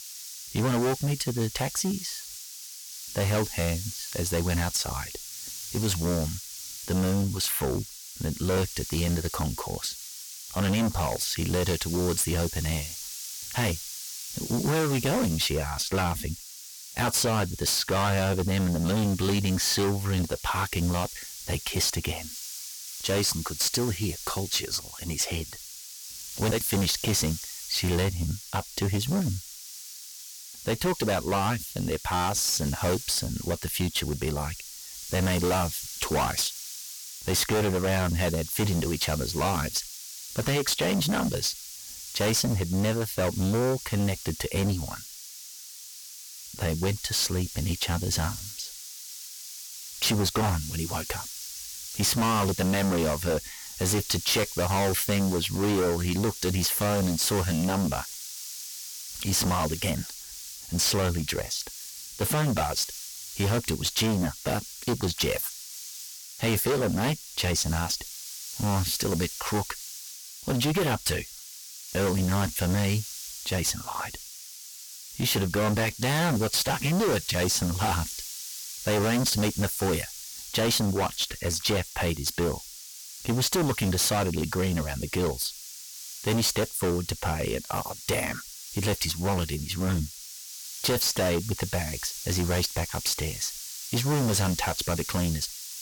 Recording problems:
distortion; heavy; 16% of the sound clipped
hiss; loud; throughout; 10 dB below the speech

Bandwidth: 18 kHz